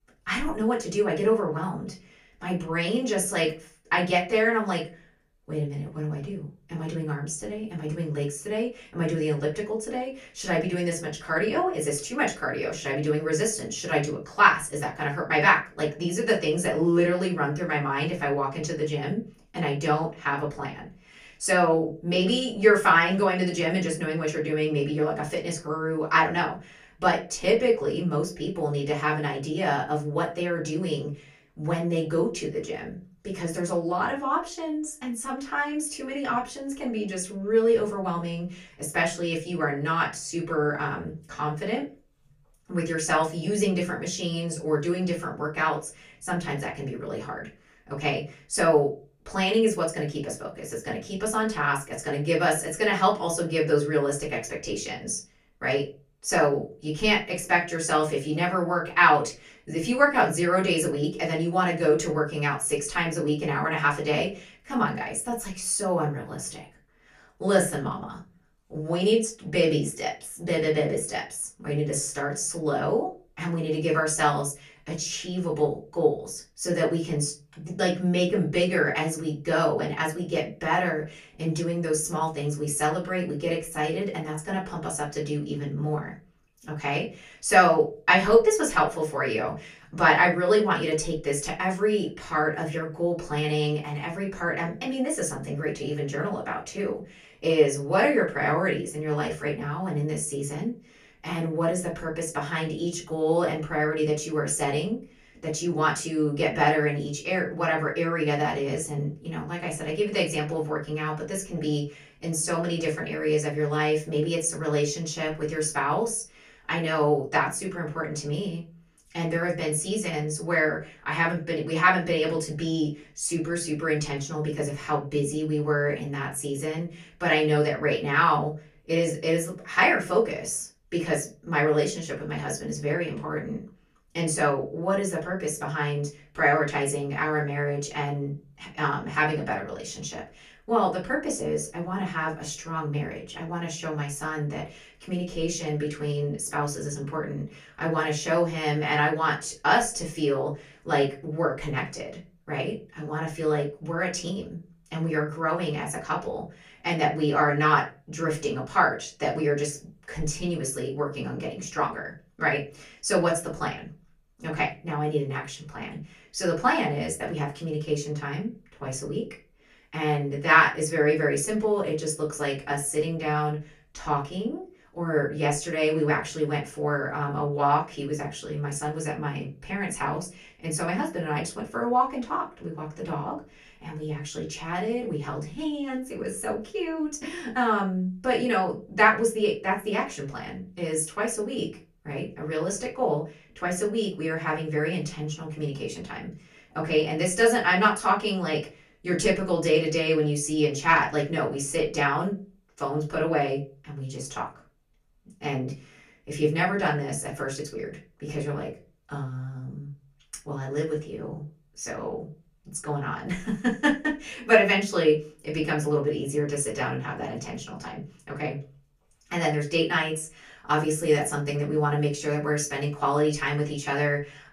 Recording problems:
off-mic speech; far
room echo; very slight; dies away in 0.3 s

